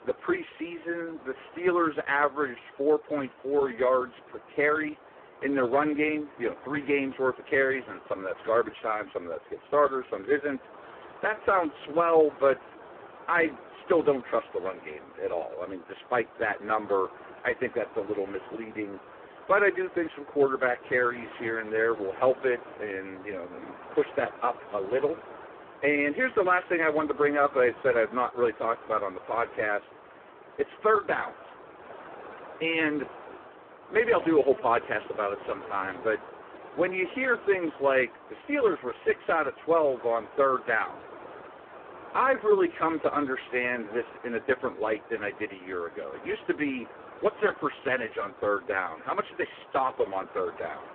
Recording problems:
phone-call audio; poor line
wind noise on the microphone; occasional gusts; 20 dB below the speech
traffic noise; faint; throughout; 25 dB below the speech

